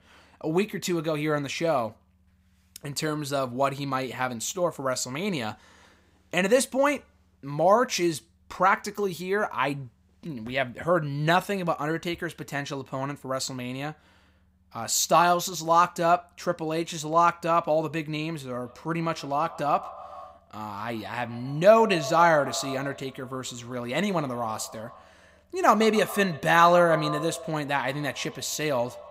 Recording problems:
echo of what is said; noticeable; from 19 s on; 130 ms later, 15 dB below the speech

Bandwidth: 15.5 kHz